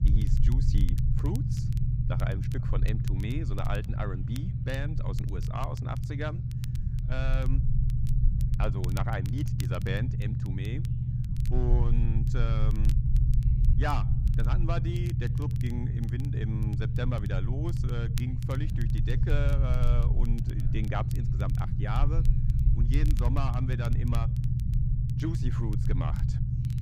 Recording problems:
low rumble; loud; throughout; 3 dB below the speech
crackle, like an old record; noticeable; 15 dB below the speech
background chatter; faint; throughout; 3 voices, 30 dB below the speech

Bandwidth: 15.5 kHz